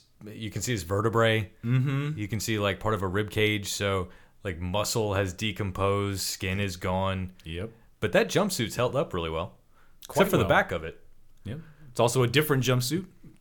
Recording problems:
none

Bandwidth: 18.5 kHz